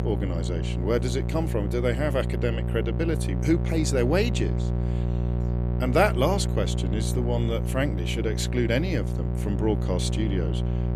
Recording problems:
electrical hum; loud; throughout; 60 Hz, 9 dB below the speech

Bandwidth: 15 kHz